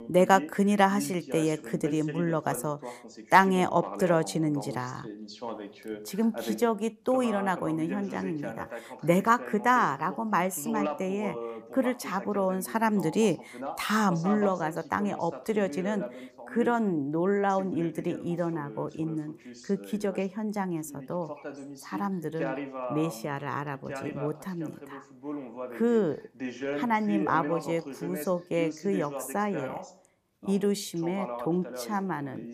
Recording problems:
voice in the background; noticeable; throughout; 10 dB below the speech

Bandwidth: 15 kHz